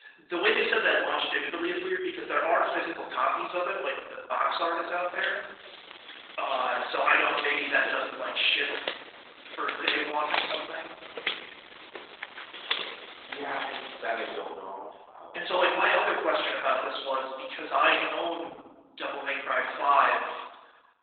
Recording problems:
off-mic speech; far
garbled, watery; badly; nothing above 4 kHz
thin; very; fading below 350 Hz
room echo; noticeable; dies away in 0.9 s
footsteps; noticeable; from 5 to 14 s; peak 1 dB below the speech

